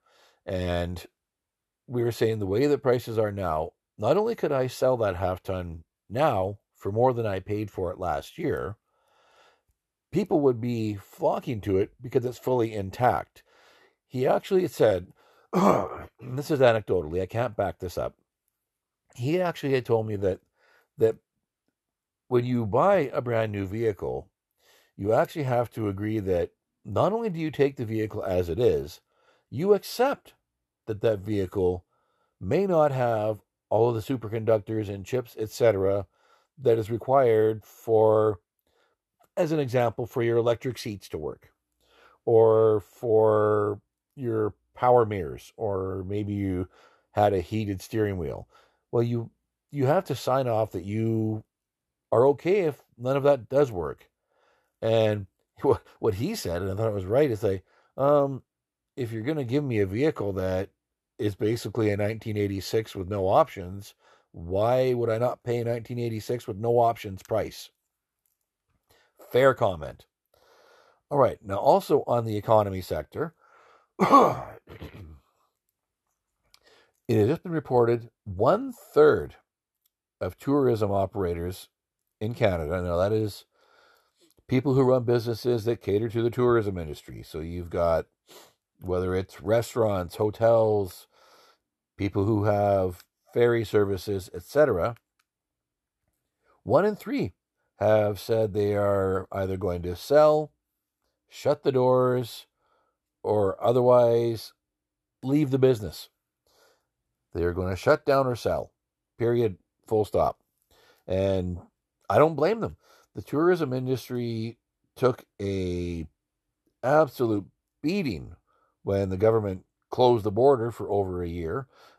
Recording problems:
none

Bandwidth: 13.5 kHz